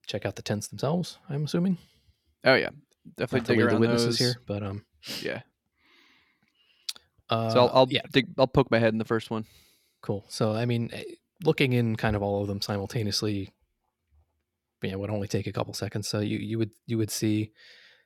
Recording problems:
none

